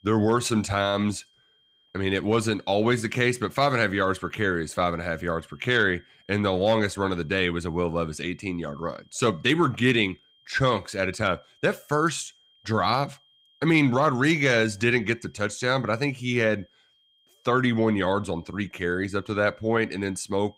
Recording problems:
high-pitched whine; faint; throughout; 3 kHz, 35 dB below the speech

